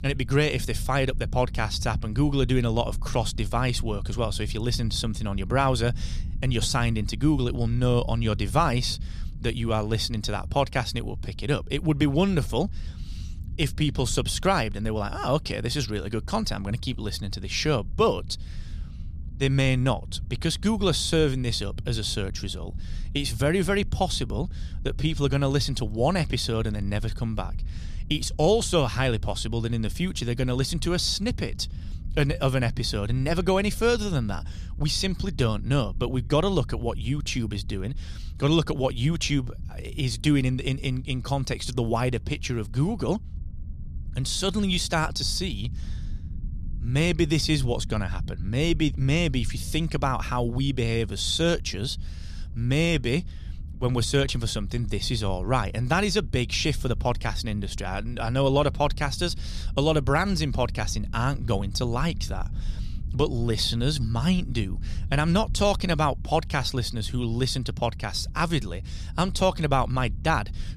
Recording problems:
low rumble; faint; throughout; 25 dB below the speech

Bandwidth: 14.5 kHz